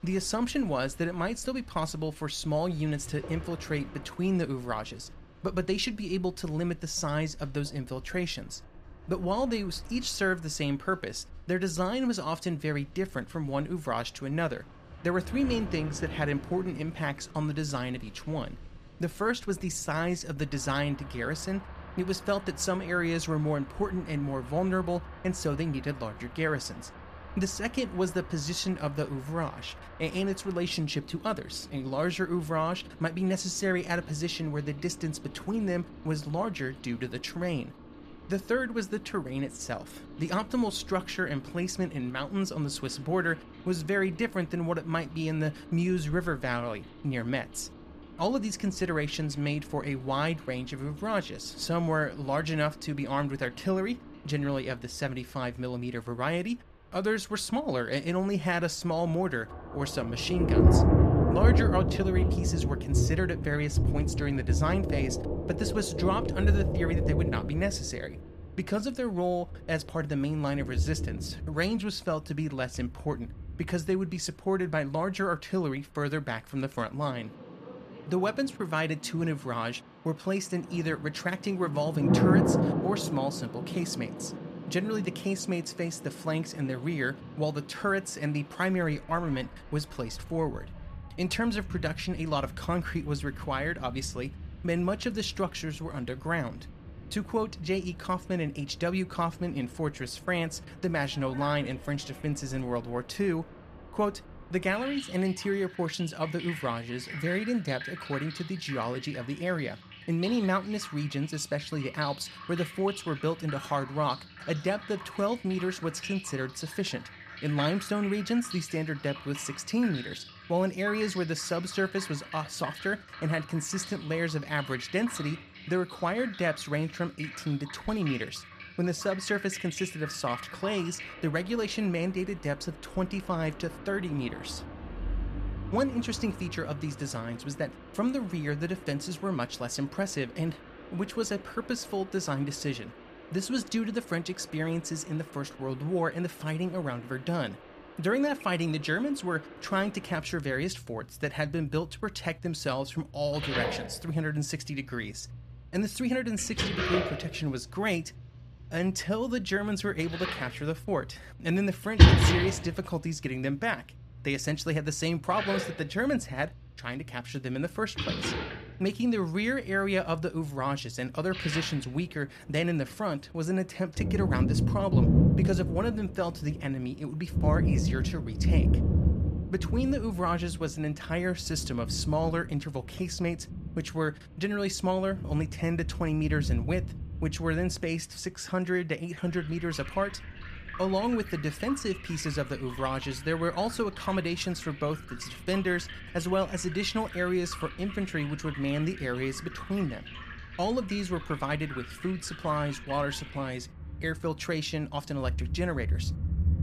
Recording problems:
rain or running water; loud; throughout; 2 dB below the speech

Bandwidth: 14.5 kHz